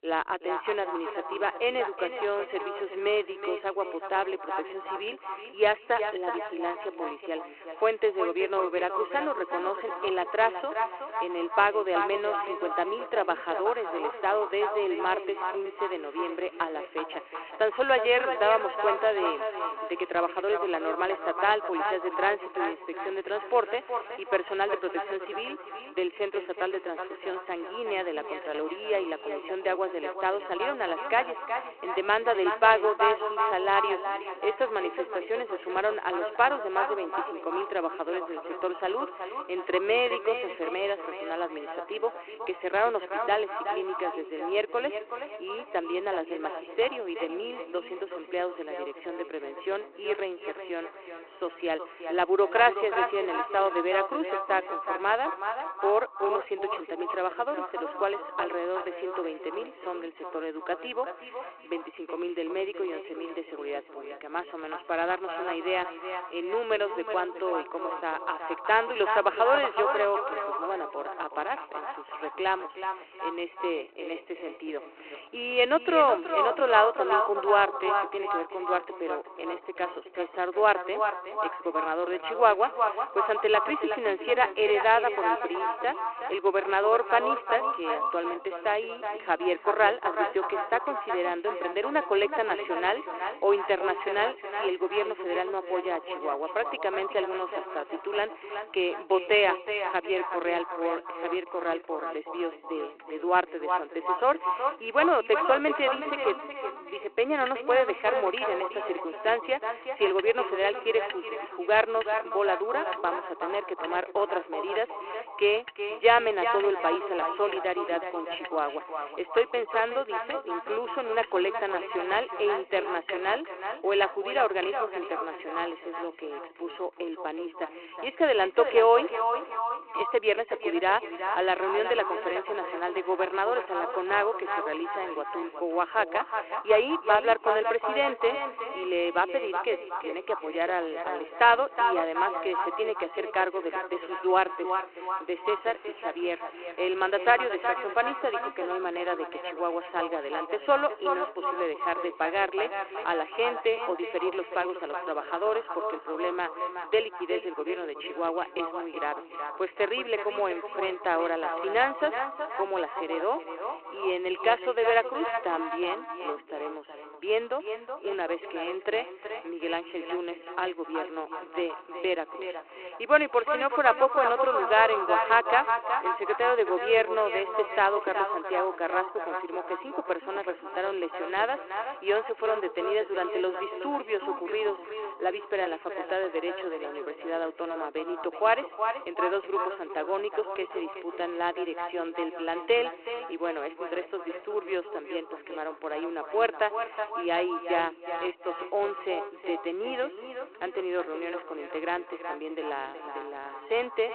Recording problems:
echo of what is said; strong; throughout; 370 ms later, 5 dB below the speech
phone-call audio; nothing above 4 kHz
traffic noise; faint; throughout; 25 dB below the speech

